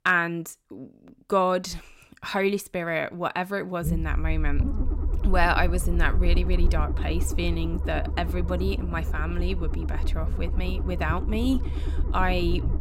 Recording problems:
low rumble; noticeable; from 4 s on; 15 dB below the speech

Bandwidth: 16 kHz